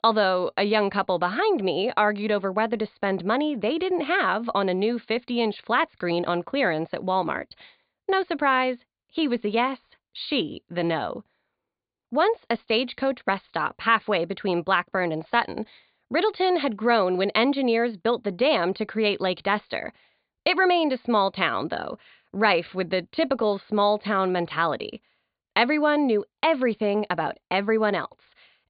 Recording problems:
high frequencies cut off; severe; nothing above 4.5 kHz

